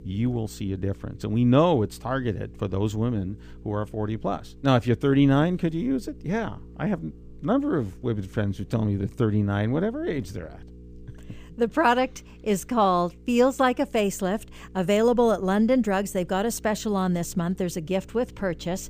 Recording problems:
electrical hum; faint; throughout; 60 Hz, 30 dB below the speech

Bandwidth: 15 kHz